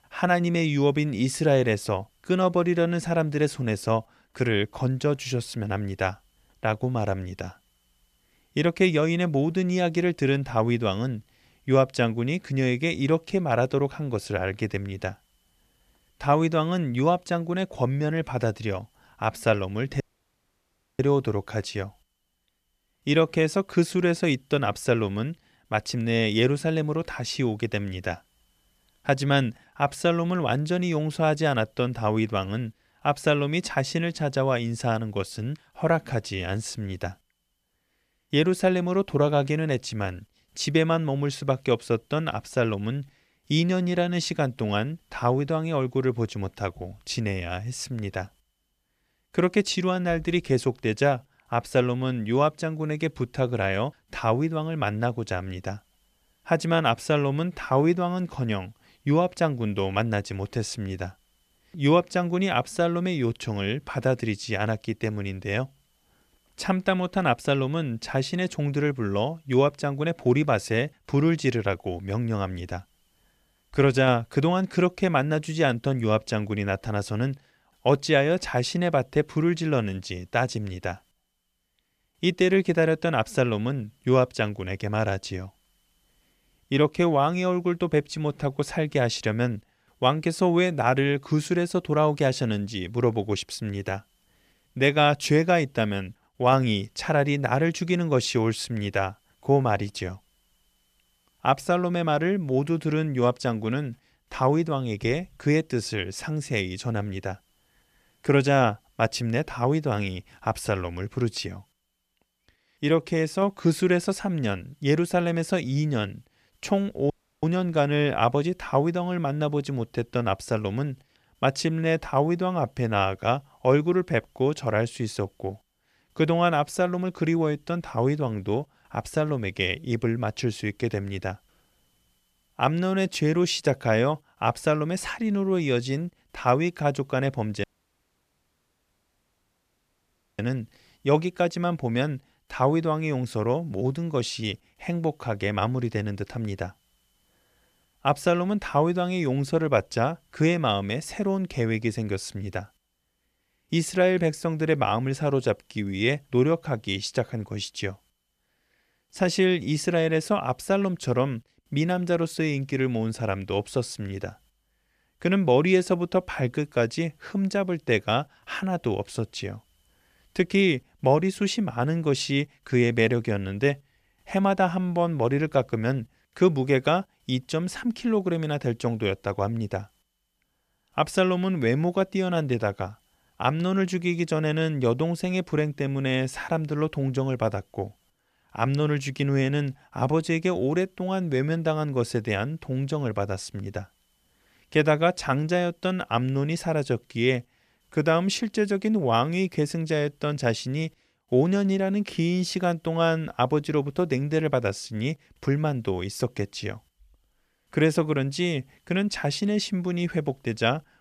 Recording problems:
audio cutting out; at 20 s for 1 s, at 1:57 and at 2:18 for 3 s

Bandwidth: 14.5 kHz